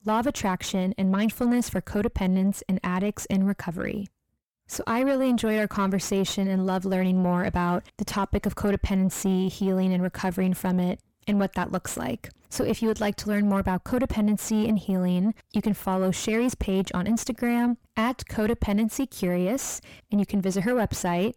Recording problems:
distortion; slight; 10 dB below the speech

